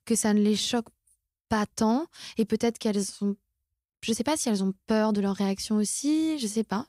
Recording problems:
none

